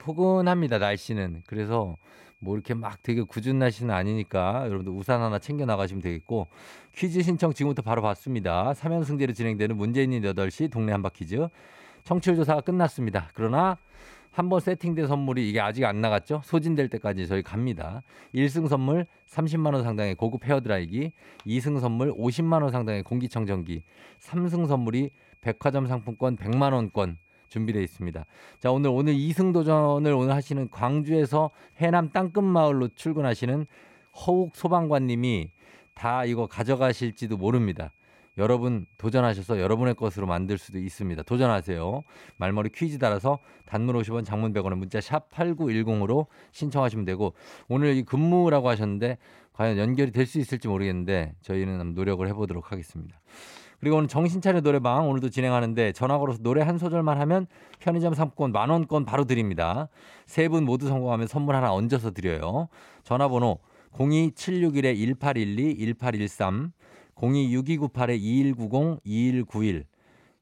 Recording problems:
high-pitched whine; faint; until 44 s; 2.5 kHz, 35 dB below the speech

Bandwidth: 16 kHz